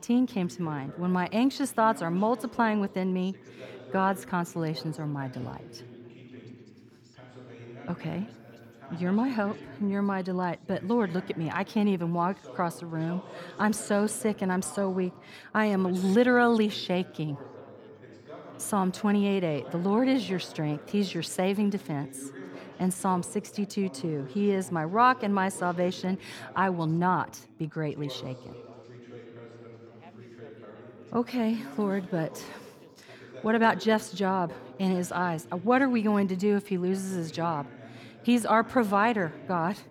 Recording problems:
background chatter; noticeable; throughout; 3 voices, 20 dB below the speech

